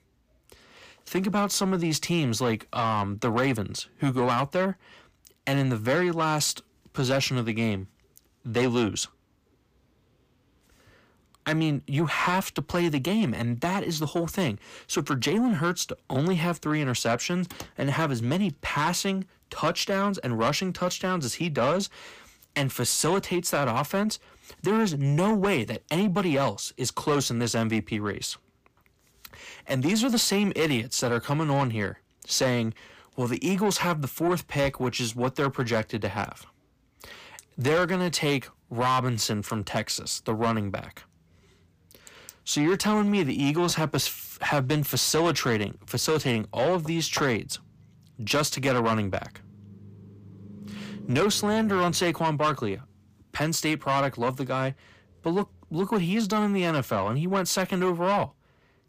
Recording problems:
distortion; slight; 10 dB below the speech

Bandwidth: 15 kHz